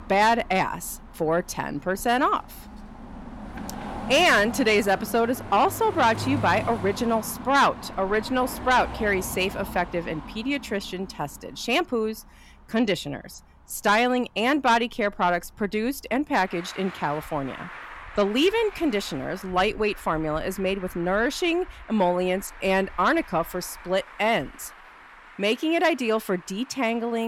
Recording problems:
distortion; slight; 10 dB below the speech
traffic noise; noticeable; throughout; 15 dB below the speech
abrupt cut into speech; at the end

